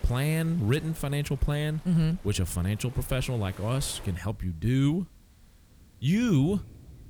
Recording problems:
rain or running water; faint; throughout; 20 dB below the speech

